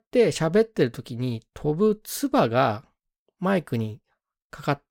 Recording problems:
none

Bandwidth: 16.5 kHz